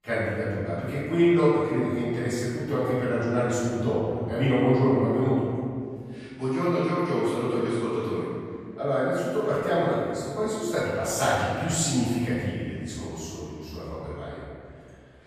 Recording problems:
room echo; strong; dies away in 2.1 s
off-mic speech; far

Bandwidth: 14 kHz